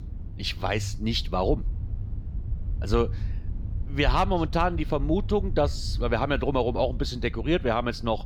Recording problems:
low rumble; faint; throughout; 20 dB below the speech

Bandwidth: 17.5 kHz